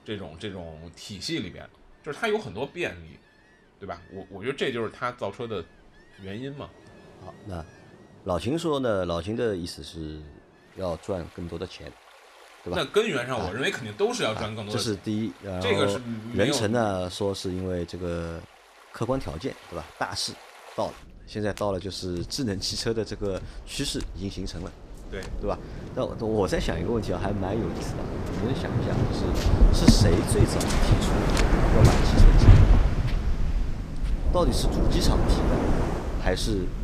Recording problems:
rain or running water; very loud; throughout; 5 dB above the speech

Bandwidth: 14.5 kHz